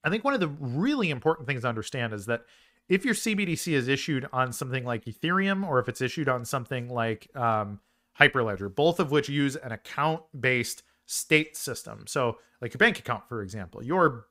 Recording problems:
none

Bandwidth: 15.5 kHz